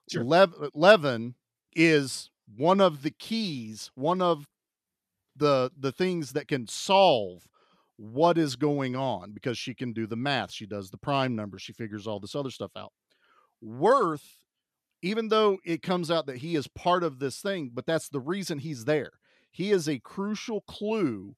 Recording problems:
none

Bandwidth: 14.5 kHz